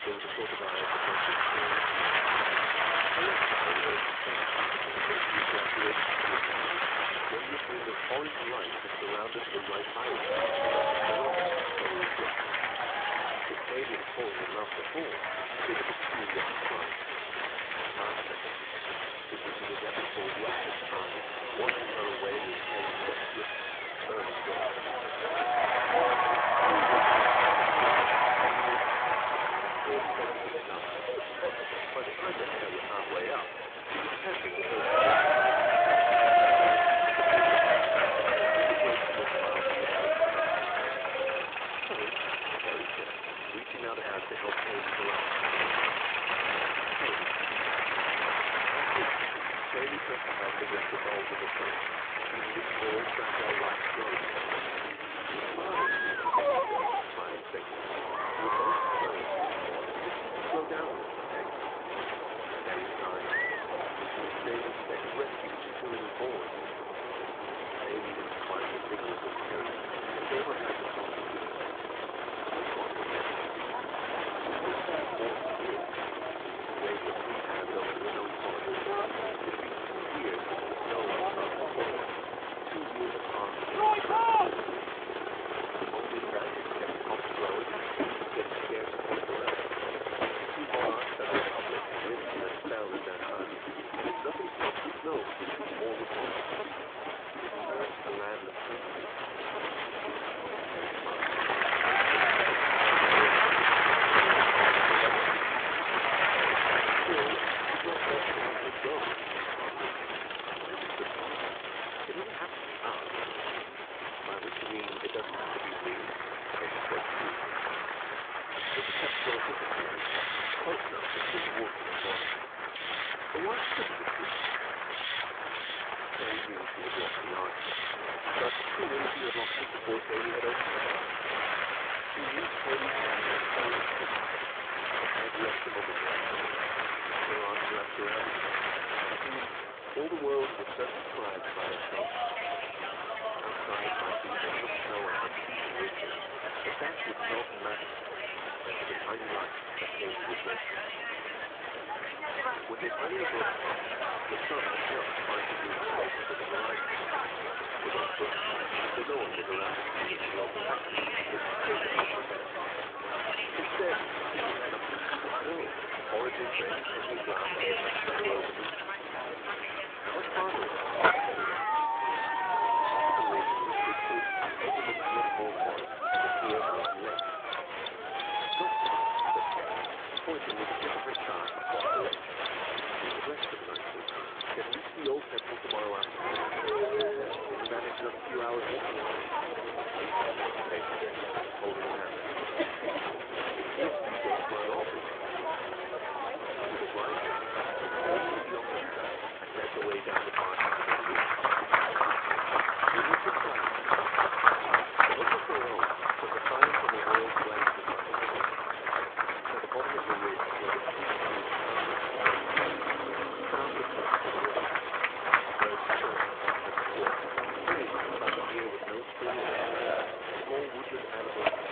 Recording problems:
phone-call audio
crowd noise; very loud; throughout; 8 dB above the speech
machinery noise; loud; throughout; 1 dB below the speech
murmuring crowd; loud; throughout; 10 dB below the speech

